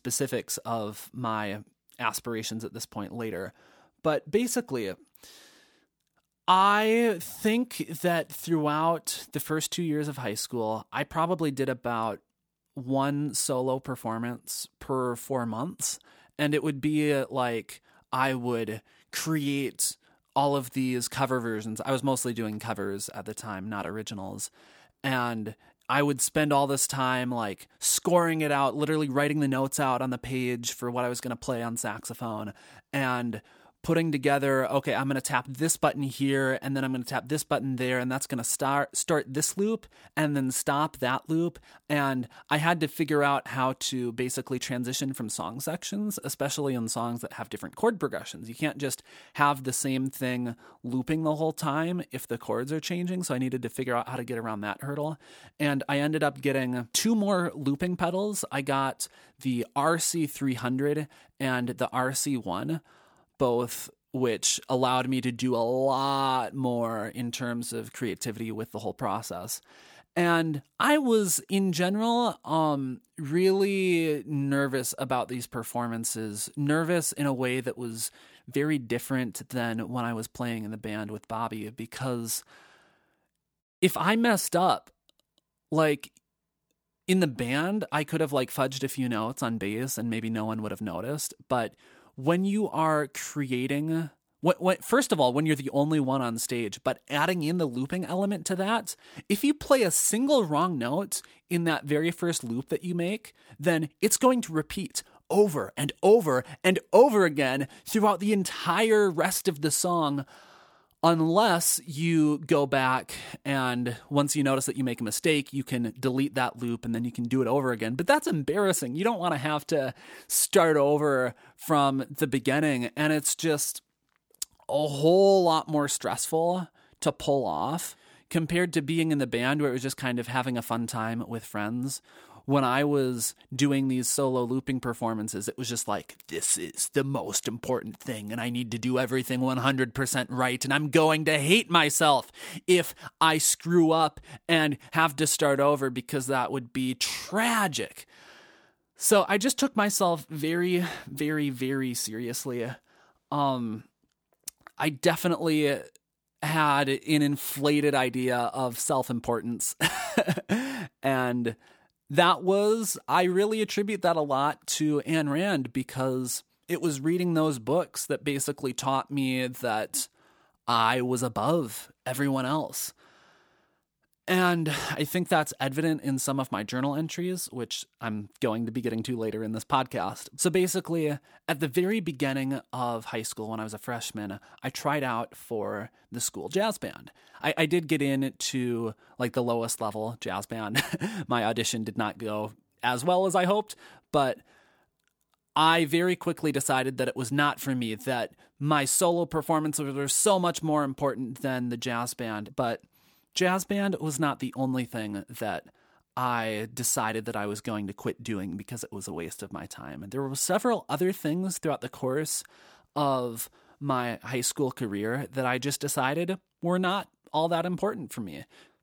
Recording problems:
none

